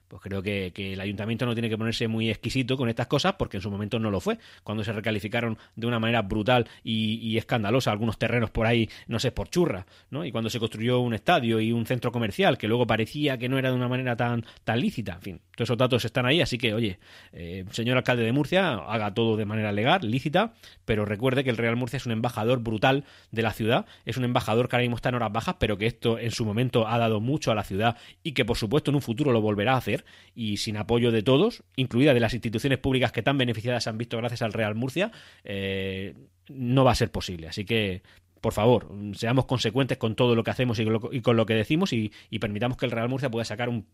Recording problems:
none

